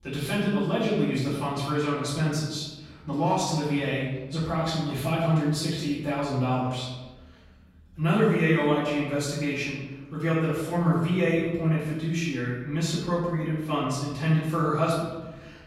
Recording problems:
off-mic speech; far
room echo; noticeable; dies away in 1.1 s

